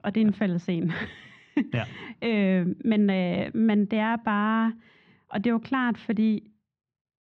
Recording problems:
muffled; very; fading above 2.5 kHz

